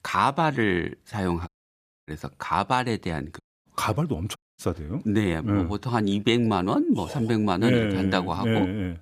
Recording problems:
audio cutting out; at 1.5 s for 0.5 s, at 3.5 s and at 4.5 s

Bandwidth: 14.5 kHz